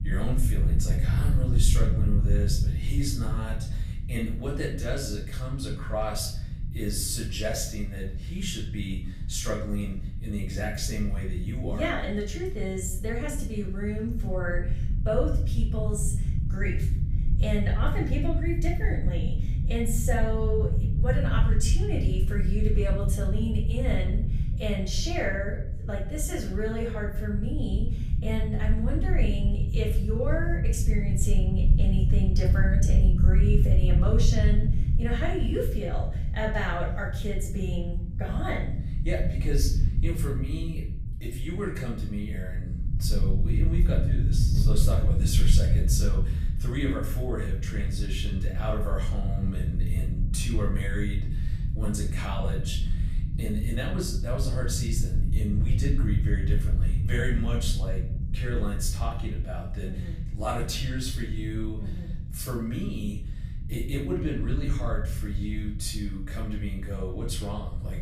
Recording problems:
off-mic speech; far
room echo; slight; dies away in 0.5 s
low rumble; loud; throughout; 9 dB below the speech

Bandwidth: 15 kHz